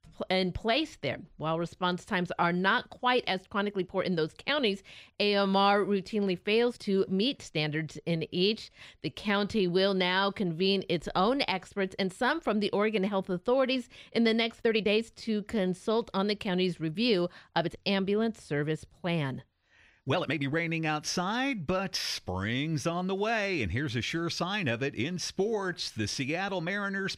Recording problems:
uneven, jittery; strongly; from 1.5 to 26 s

